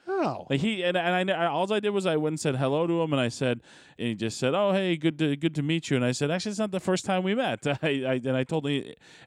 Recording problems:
none

